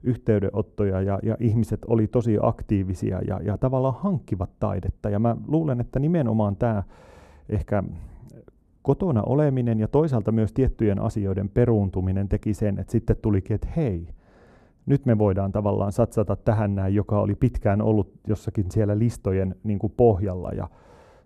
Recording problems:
muffled; very; fading above 1.5 kHz

